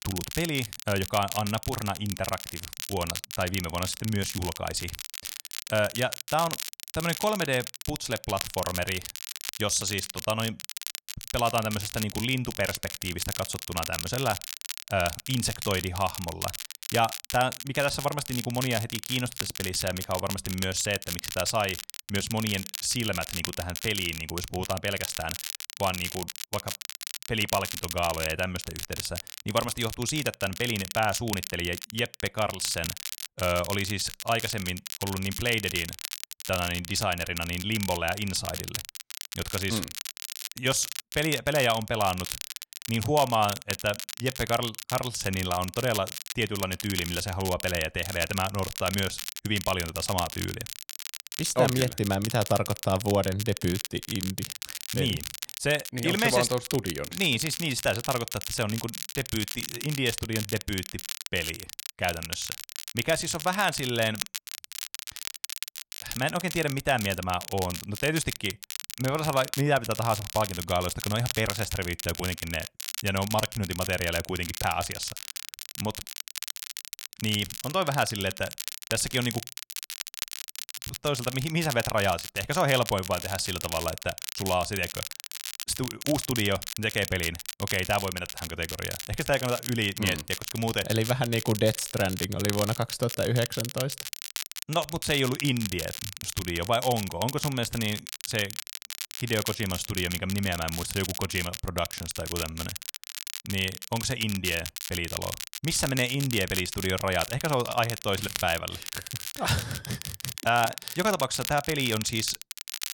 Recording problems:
crackle, like an old record; loud; 6 dB below the speech

